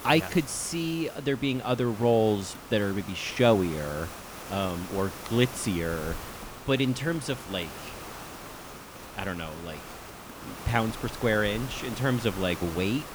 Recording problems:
hiss; noticeable; throughout; 10 dB below the speech

